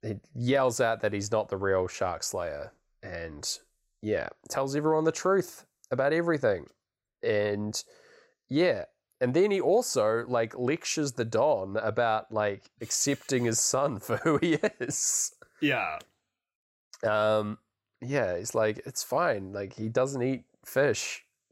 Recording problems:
none

